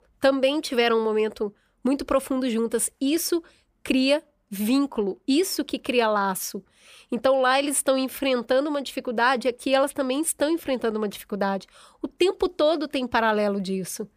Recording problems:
none

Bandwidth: 15 kHz